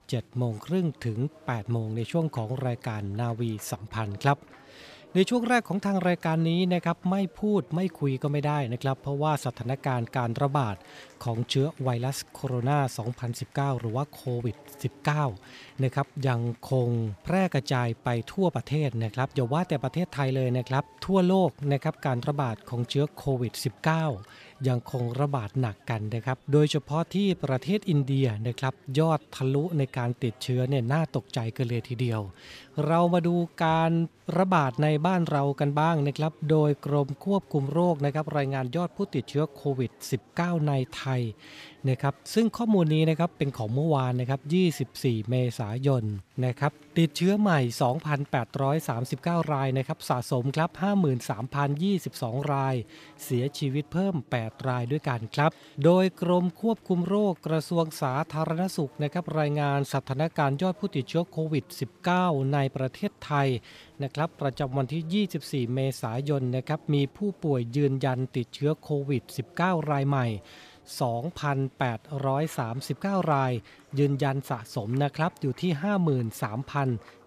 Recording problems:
chatter from many people; faint; throughout; 25 dB below the speech

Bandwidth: 14.5 kHz